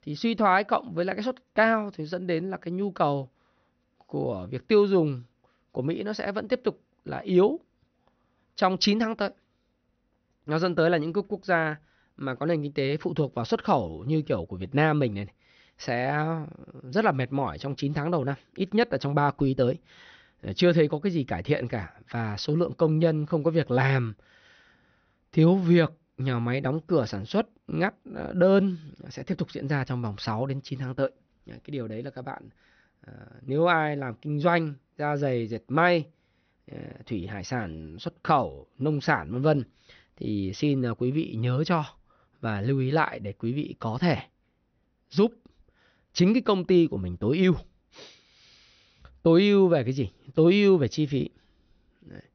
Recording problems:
high frequencies cut off; noticeable; nothing above 6 kHz

